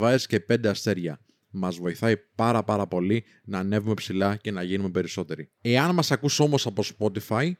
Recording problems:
abrupt cut into speech; at the start

